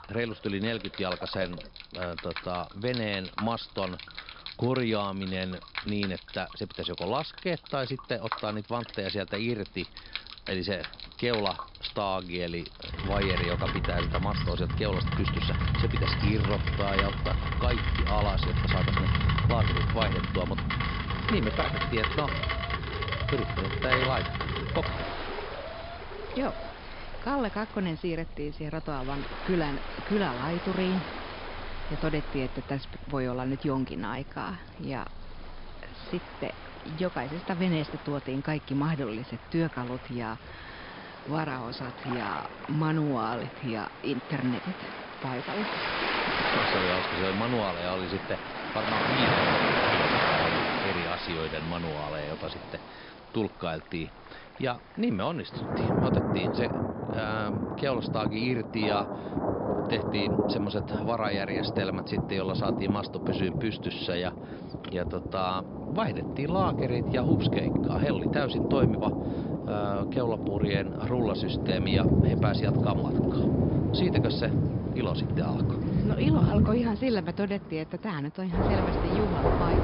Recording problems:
high frequencies cut off; noticeable; nothing above 5.5 kHz
rain or running water; very loud; throughout; 2 dB above the speech
alarm; noticeable; from 21 to 27 s; peak 10 dB below the speech
jangling keys; faint; at 46 s; peak 15 dB below the speech

